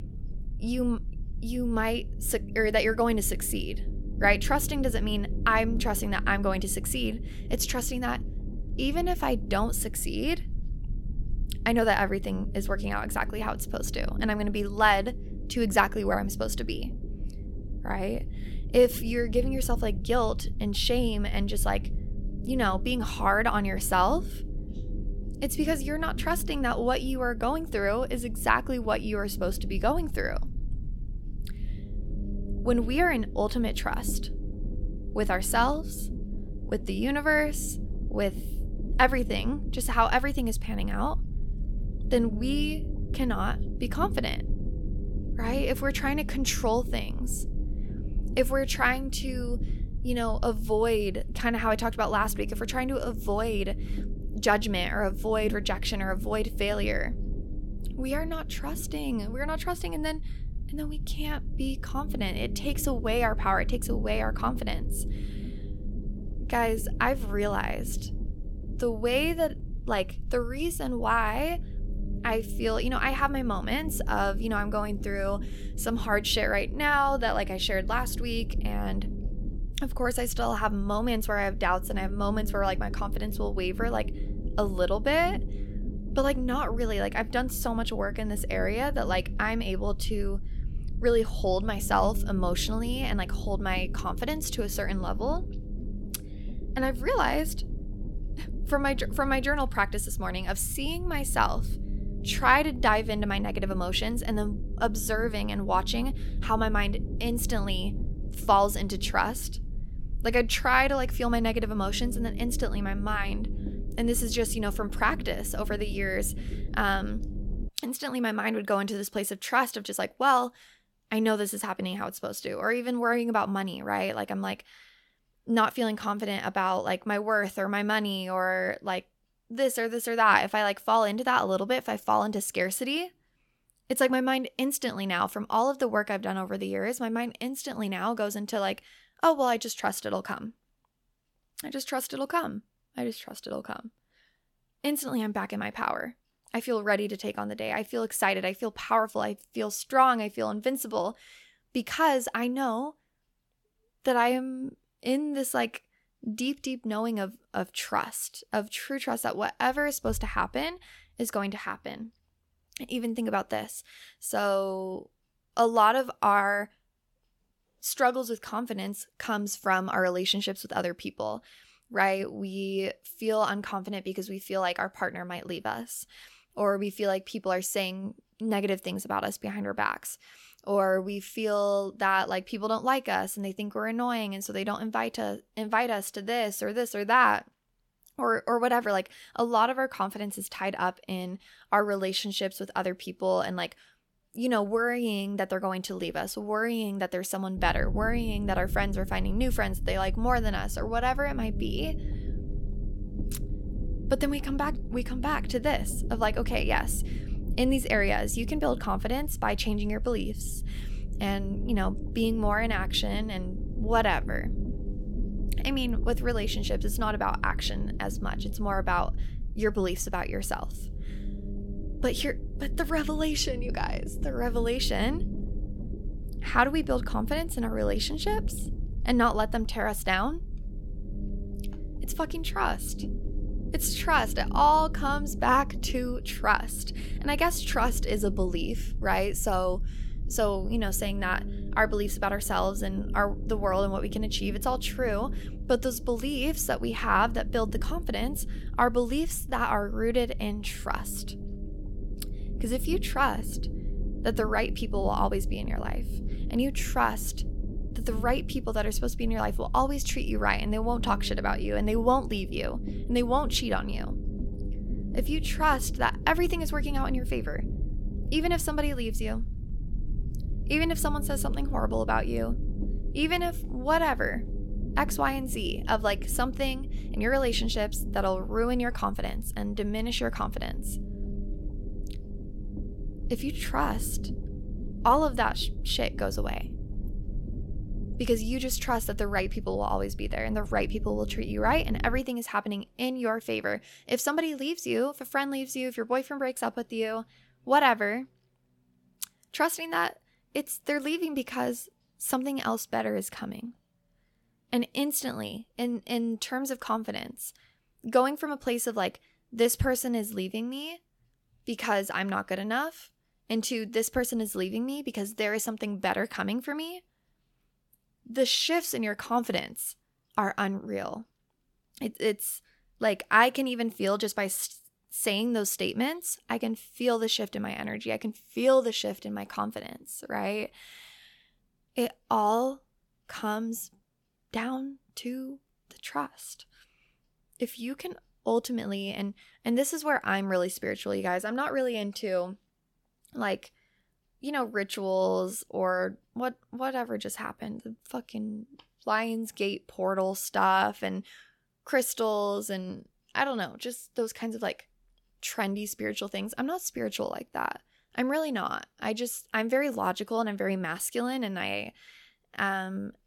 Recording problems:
low rumble; noticeable; until 1:58 and from 3:18 to 4:52; 20 dB below the speech

